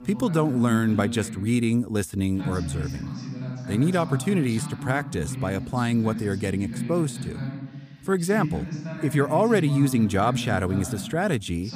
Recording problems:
voice in the background; loud; throughout; 8 dB below the speech

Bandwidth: 15 kHz